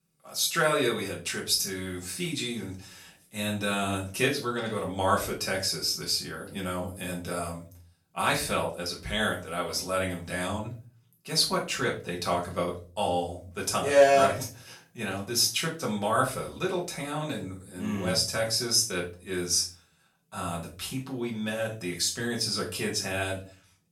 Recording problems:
off-mic speech; far
room echo; slight; dies away in 0.3 s

